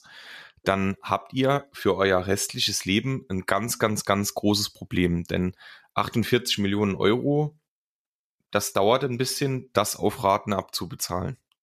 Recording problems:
none

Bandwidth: 14.5 kHz